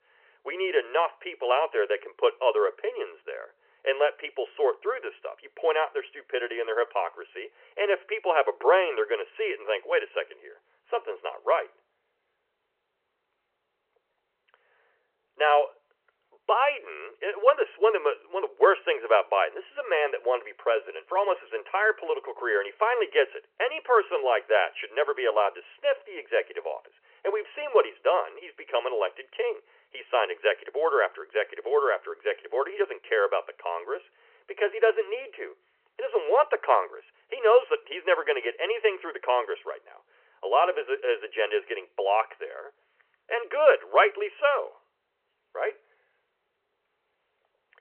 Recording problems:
phone-call audio; nothing above 3 kHz

